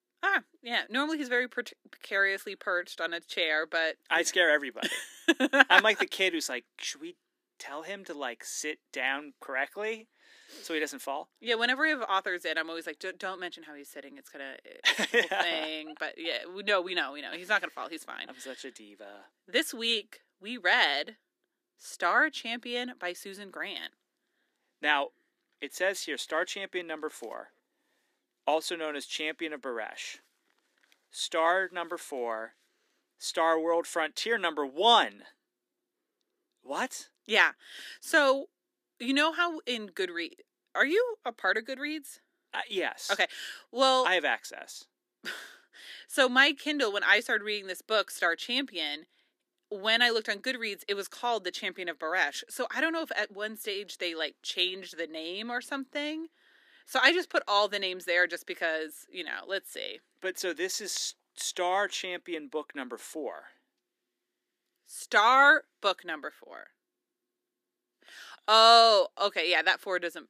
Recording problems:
thin; somewhat; fading below 250 Hz

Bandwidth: 15 kHz